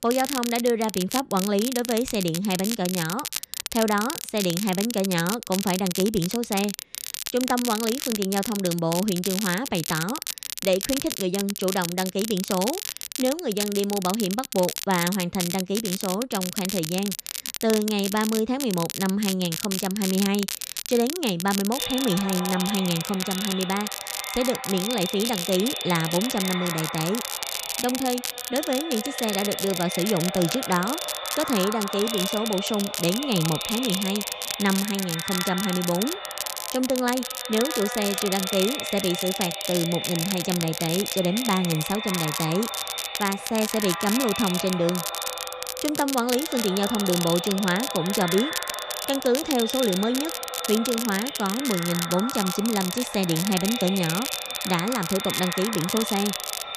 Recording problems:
echo of what is said; strong; from 22 s on; 150 ms later, 7 dB below the speech
crackle, like an old record; loud; 5 dB below the speech

